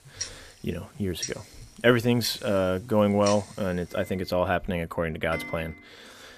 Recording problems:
household noises; noticeable; throughout; 10 dB below the speech

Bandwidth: 14.5 kHz